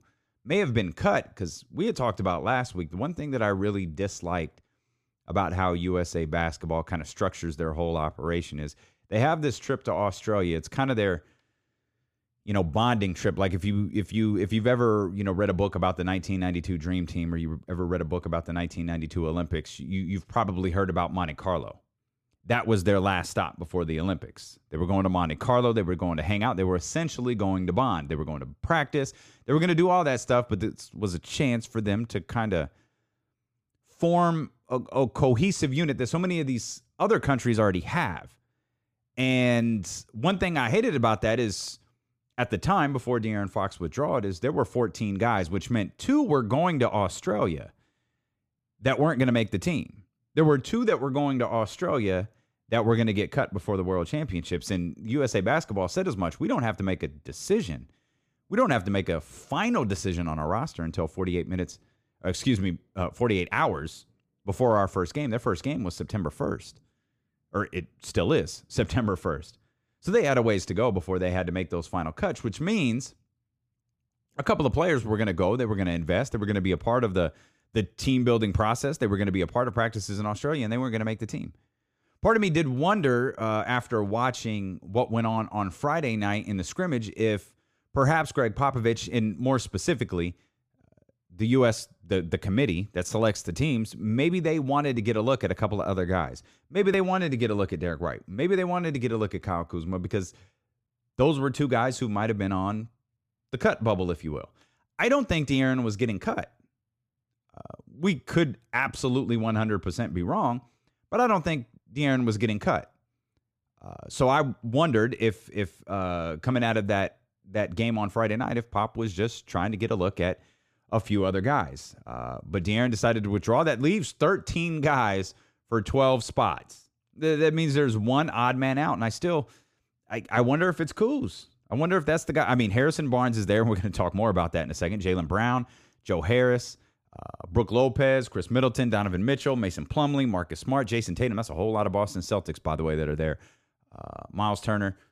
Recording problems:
none

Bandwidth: 15 kHz